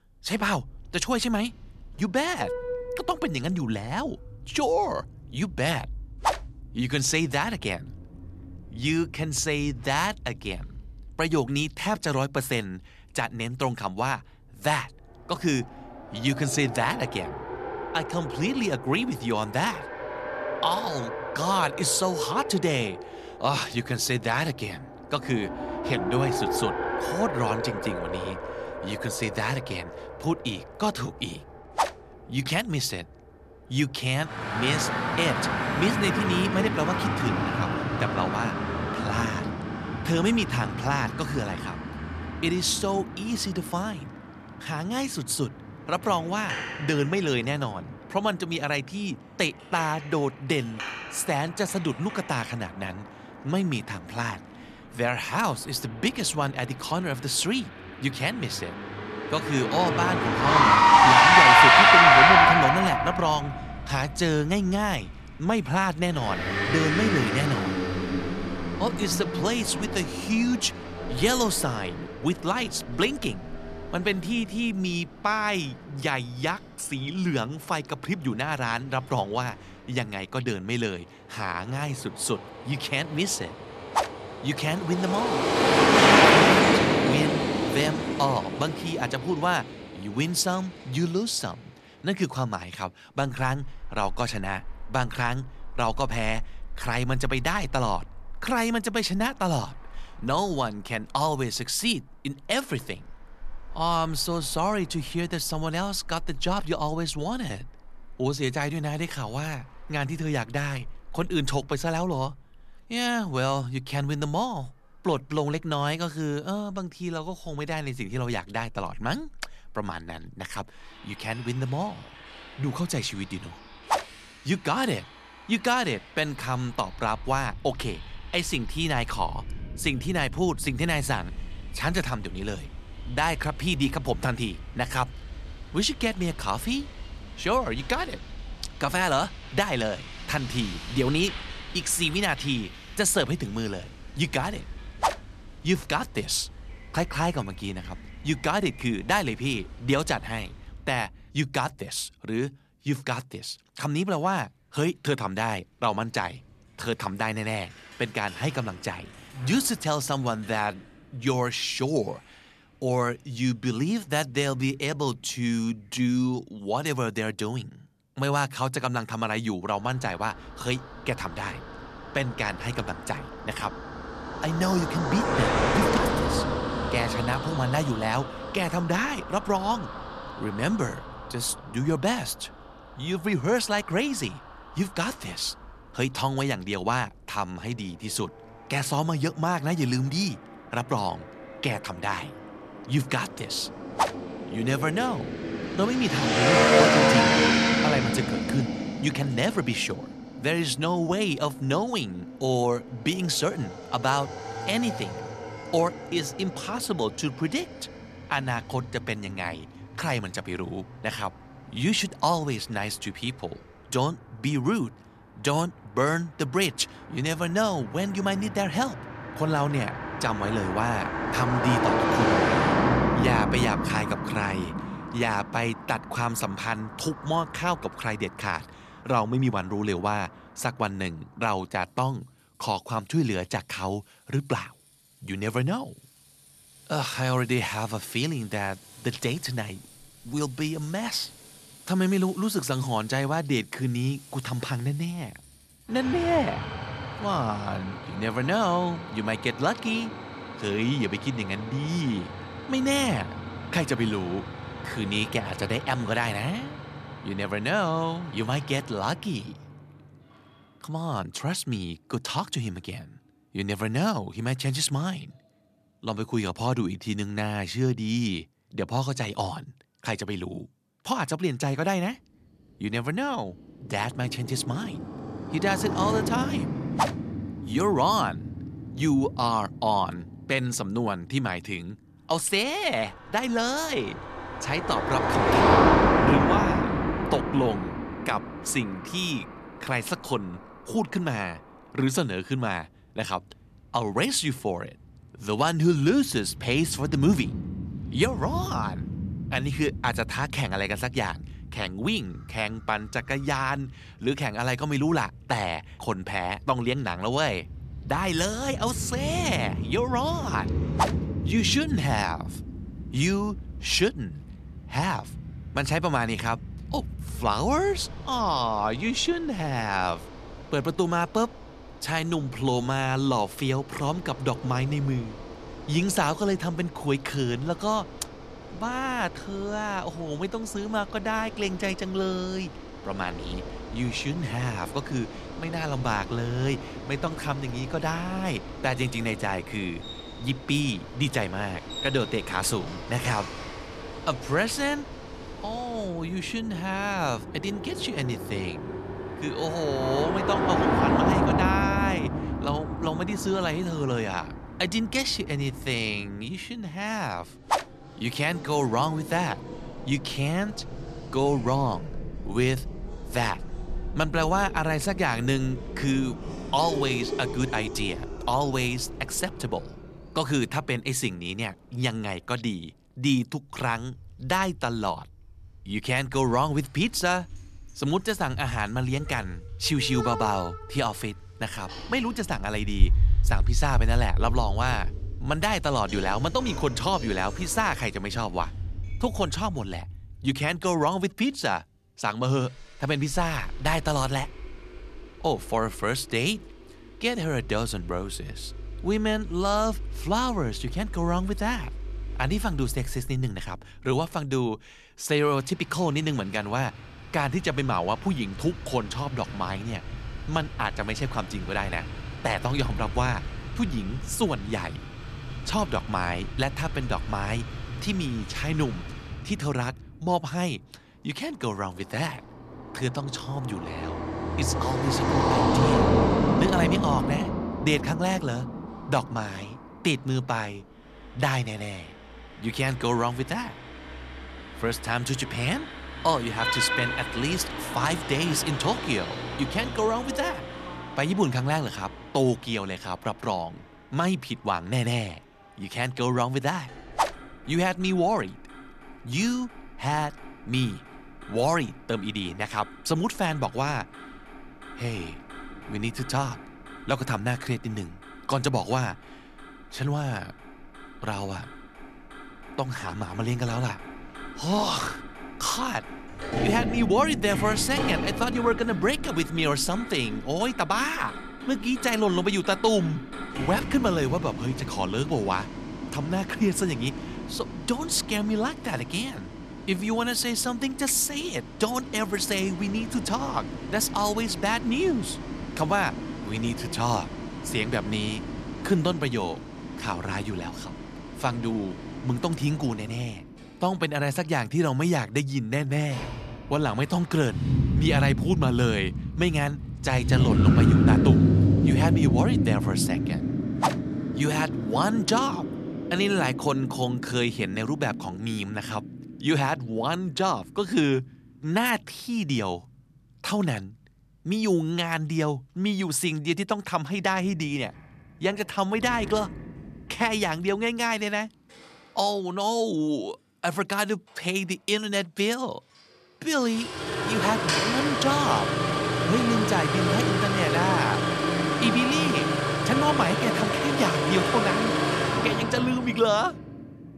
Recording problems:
traffic noise; loud; throughout; as loud as the speech

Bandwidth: 14 kHz